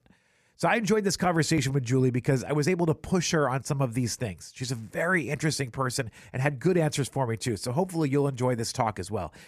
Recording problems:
none

